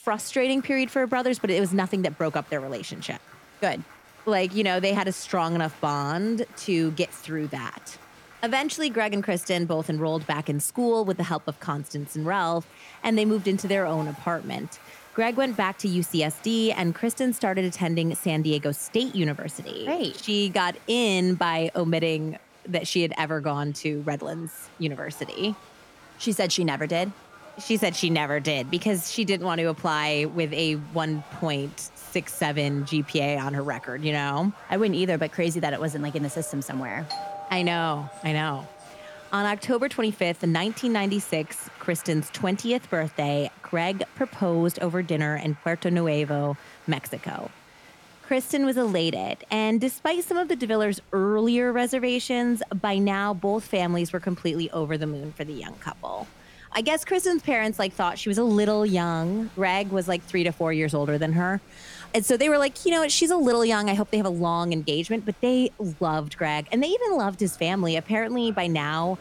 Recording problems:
crowd noise; faint; throughout; 25 dB below the speech
doorbell; noticeable; from 37 to 39 s; peak 8 dB below the speech

